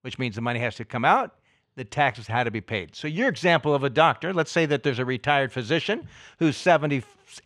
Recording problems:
muffled; slightly; fading above 3.5 kHz

